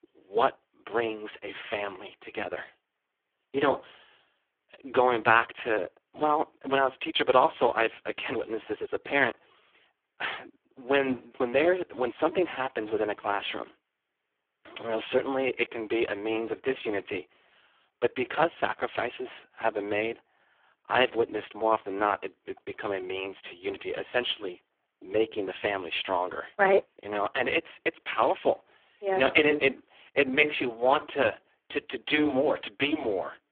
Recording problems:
phone-call audio; poor line

